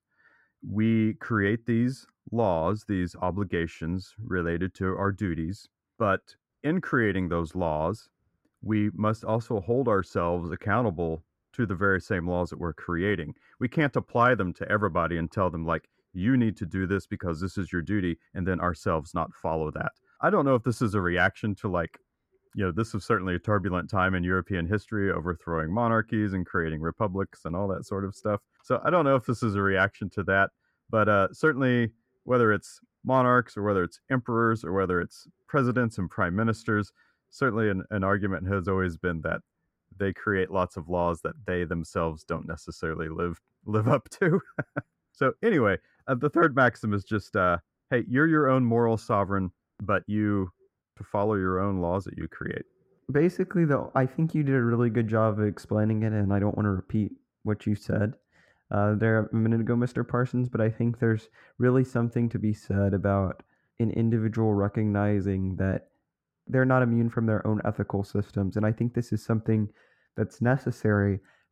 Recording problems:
muffled; very; fading above 2.5 kHz

